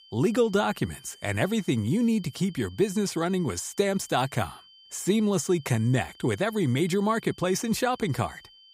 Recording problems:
high-pitched whine; faint; throughout; 3 kHz, 25 dB below the speech

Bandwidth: 15.5 kHz